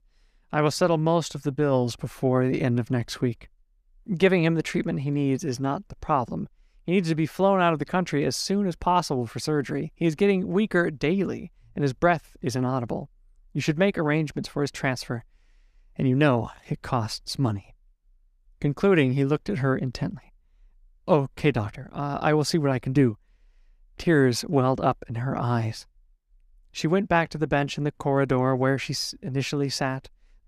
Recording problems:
none

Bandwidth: 14.5 kHz